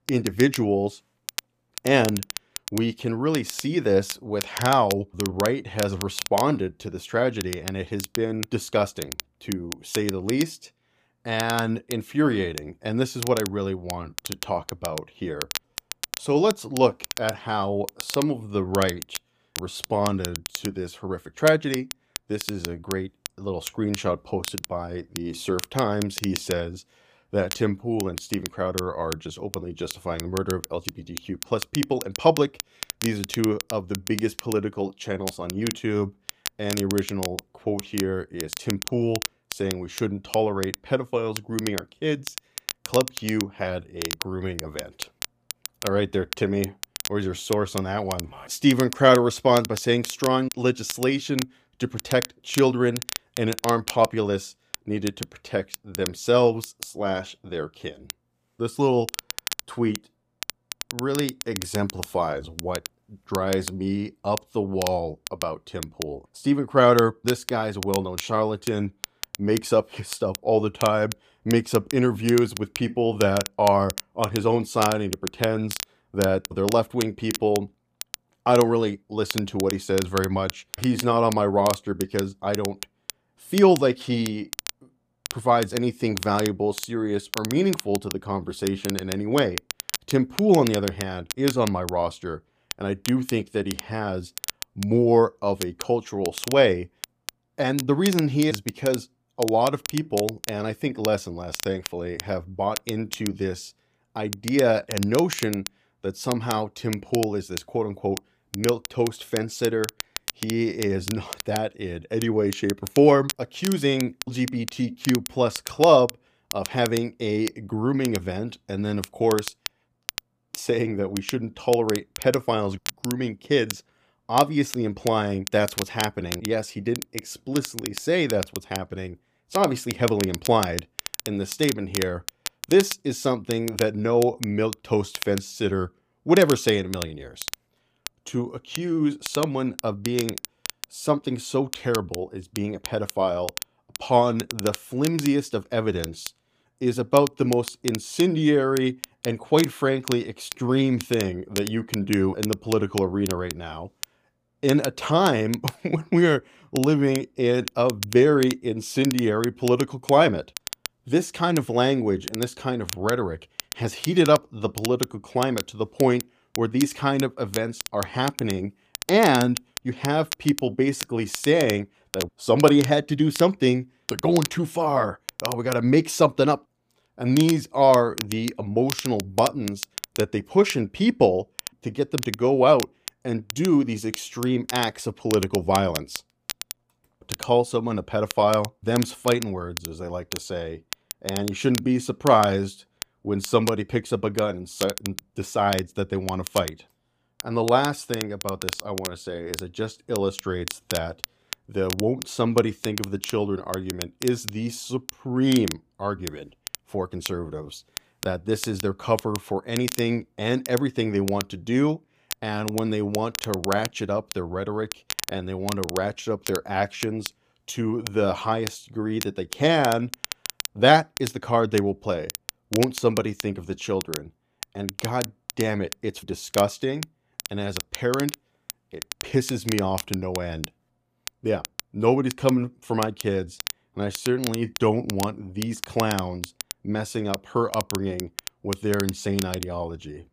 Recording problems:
crackle, like an old record; noticeable; 10 dB below the speech

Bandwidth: 15 kHz